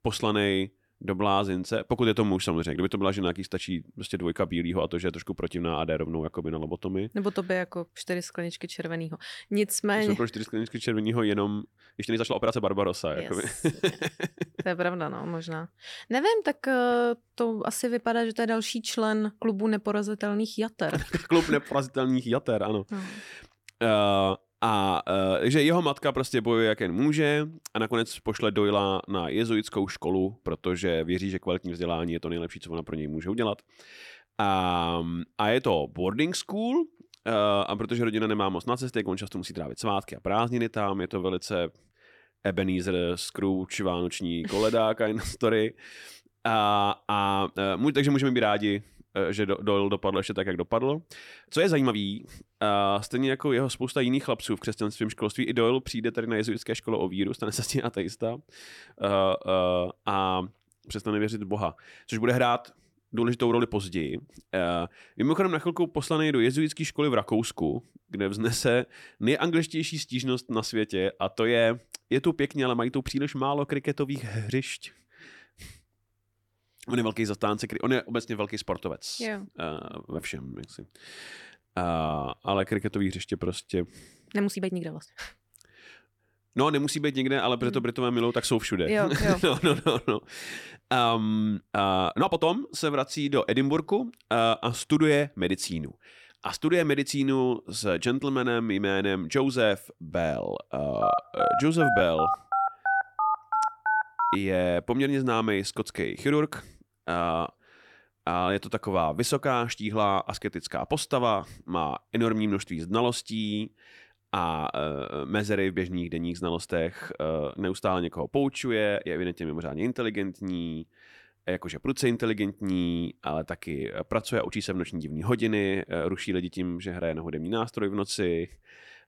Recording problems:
uneven, jittery; strongly; from 10 s to 2:05
phone ringing; loud; from 1:41 to 1:44; peak 2 dB above the speech

